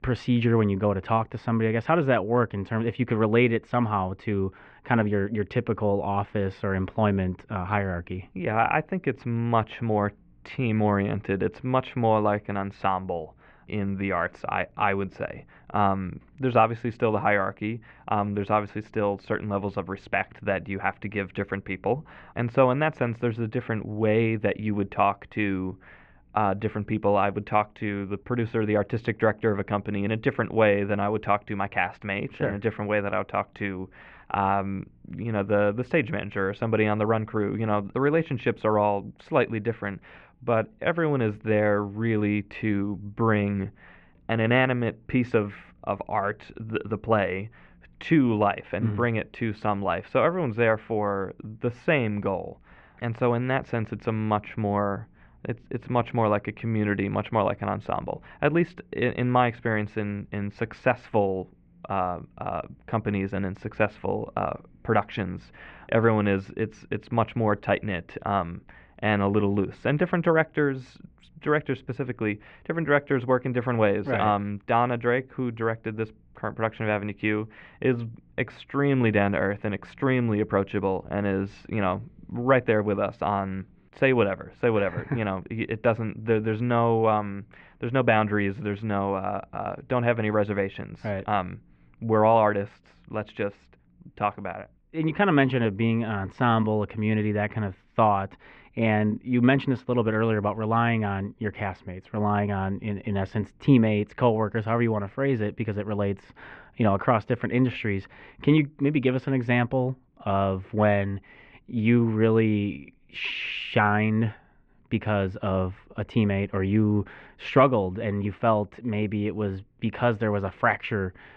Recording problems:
muffled; very; fading above 2.5 kHz

